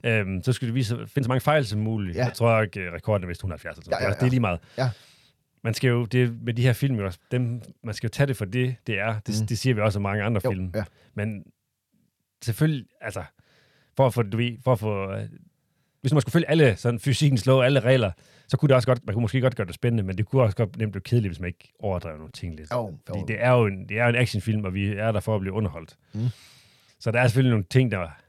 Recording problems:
uneven, jittery; strongly; from 1 to 23 s

